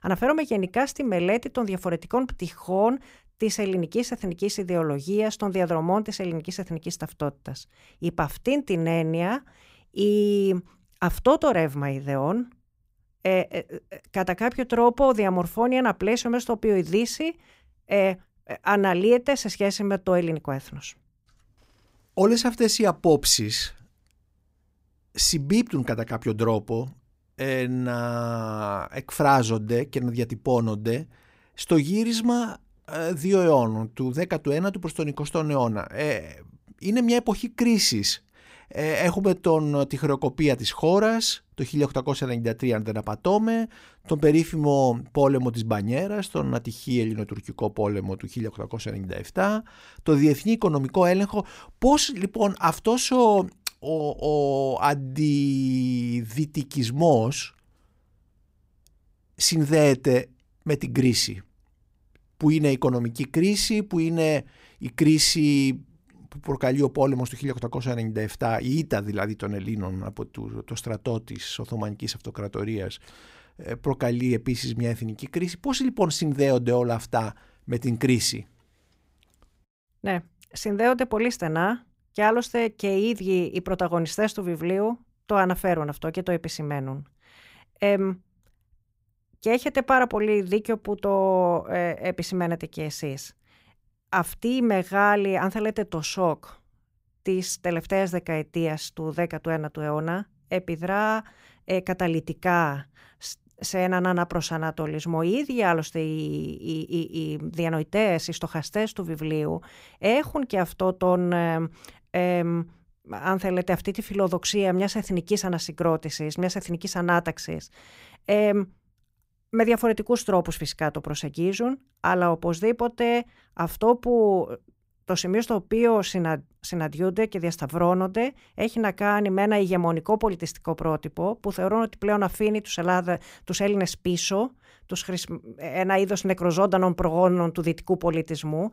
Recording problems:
none

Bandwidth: 15.5 kHz